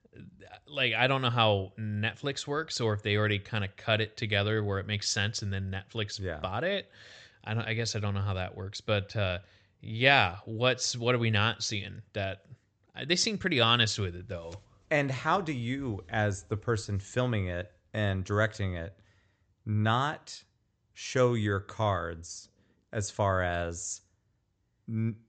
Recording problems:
high frequencies cut off; noticeable; nothing above 8 kHz

